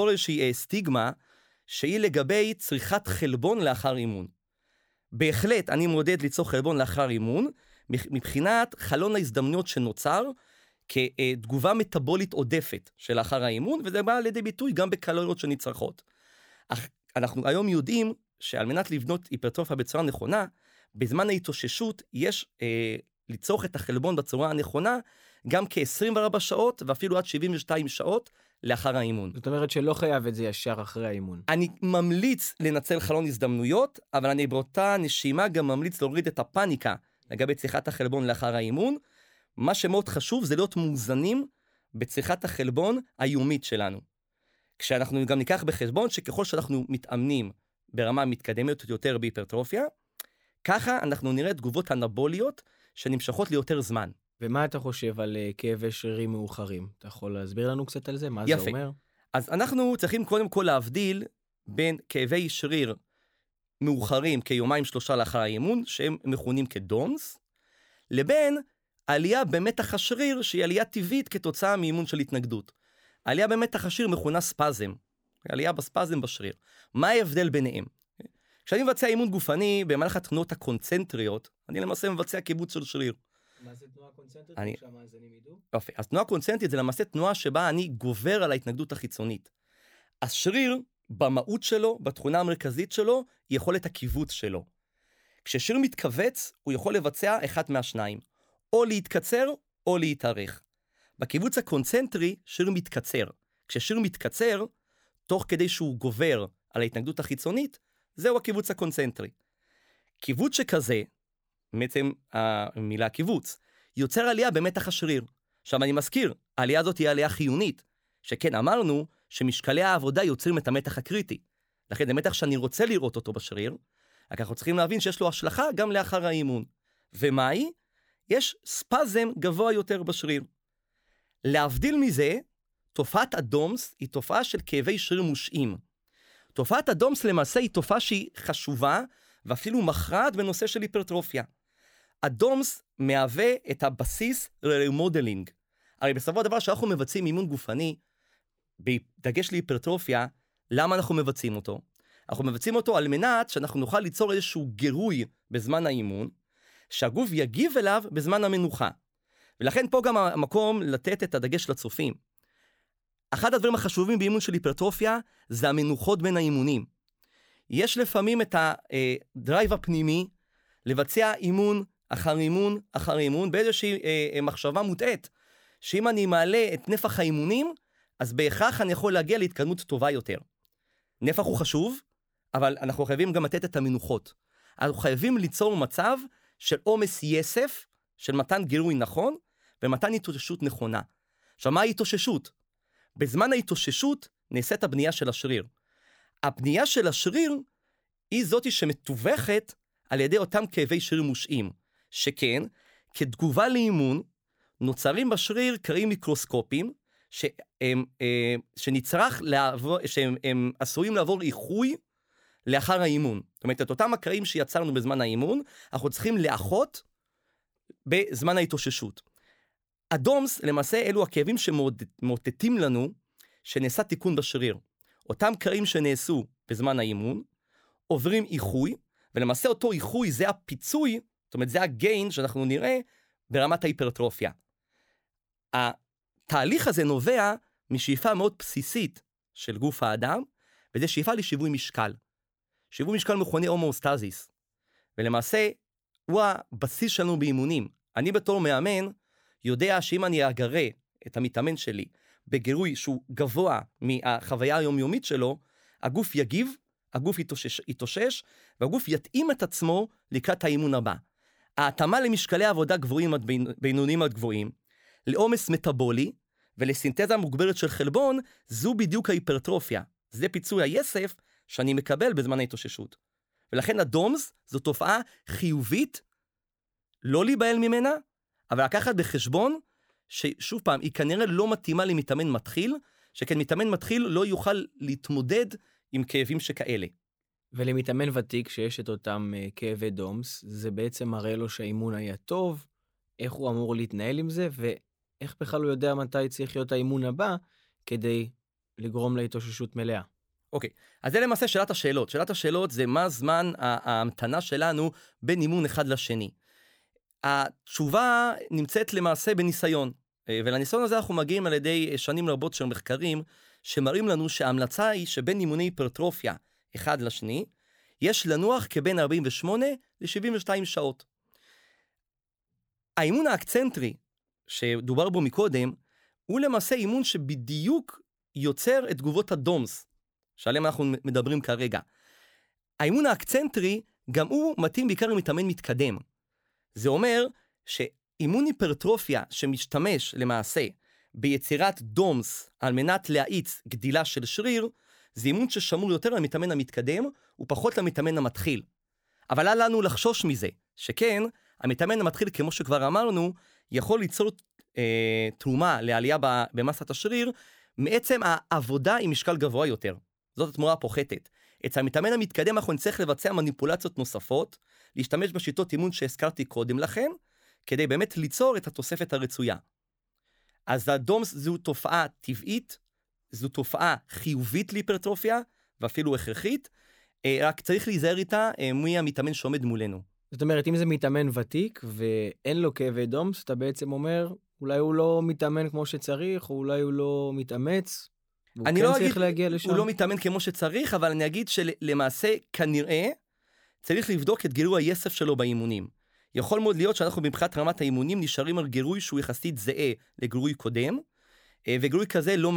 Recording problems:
abrupt cut into speech; at the start and the end

